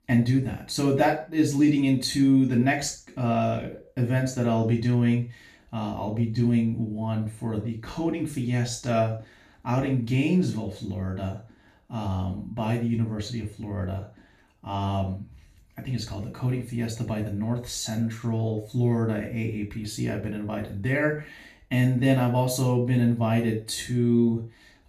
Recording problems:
off-mic speech; far
room echo; slight; dies away in 0.3 s

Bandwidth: 14.5 kHz